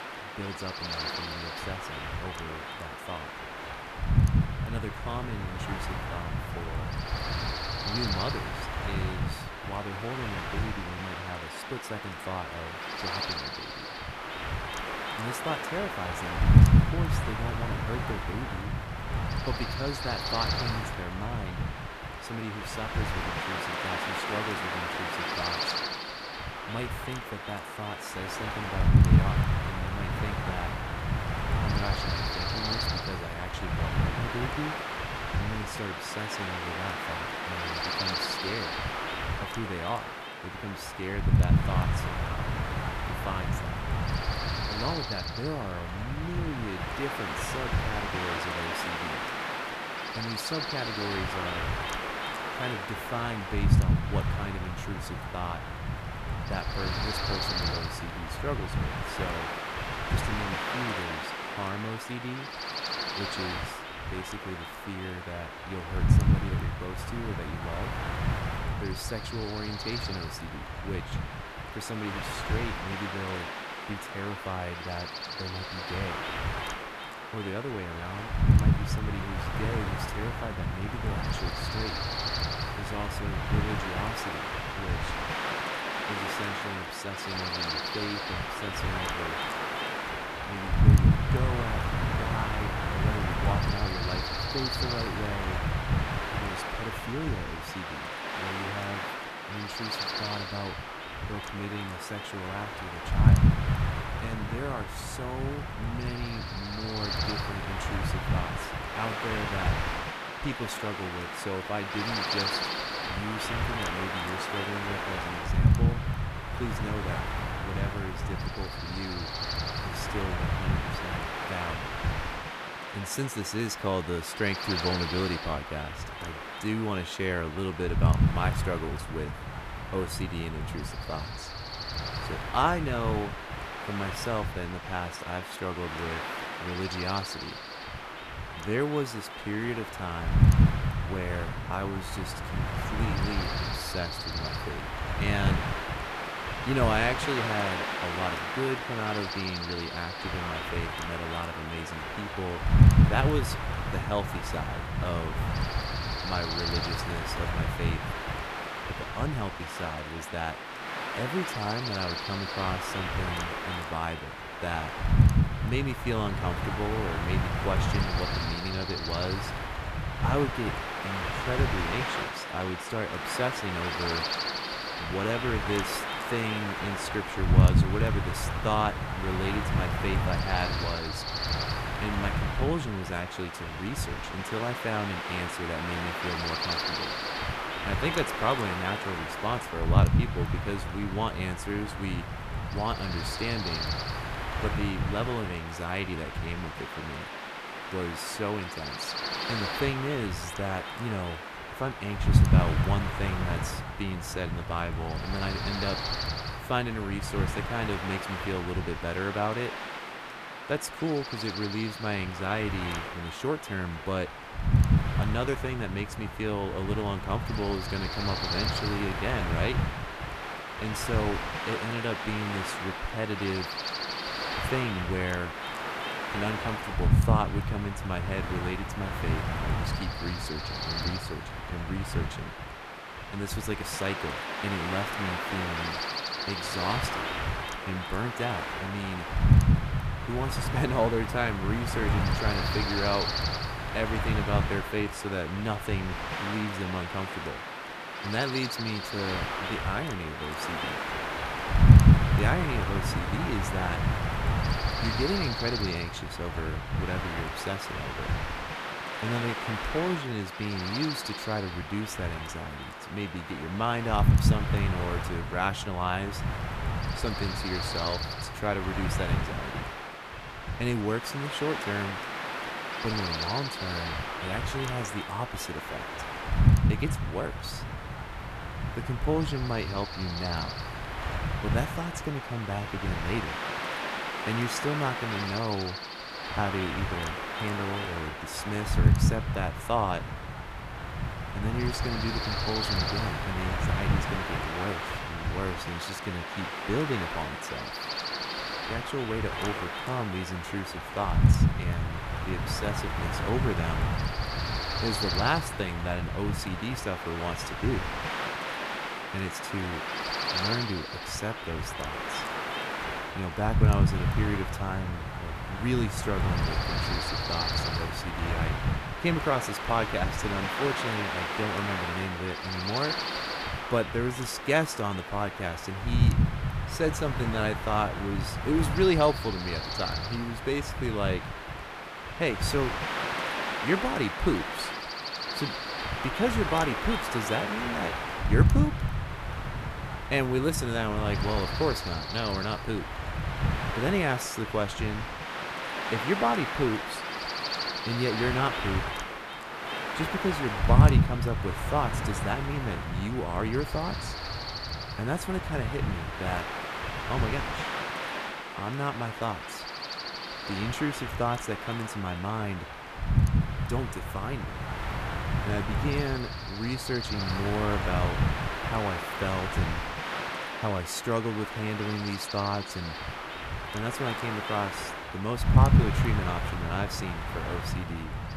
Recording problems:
wind noise on the microphone; heavy; 2 dB above the speech

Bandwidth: 14.5 kHz